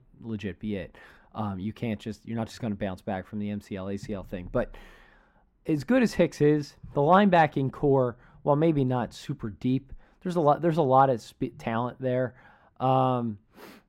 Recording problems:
muffled; slightly; fading above 2.5 kHz

